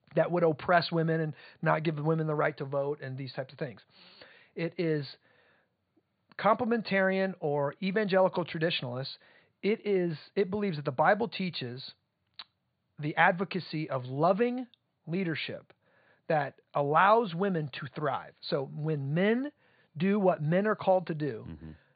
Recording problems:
high frequencies cut off; severe; nothing above 4.5 kHz

